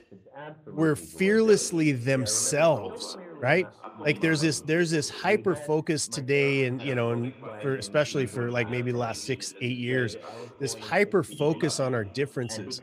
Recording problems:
background chatter; noticeable; throughout; 2 voices, 15 dB below the speech

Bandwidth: 15 kHz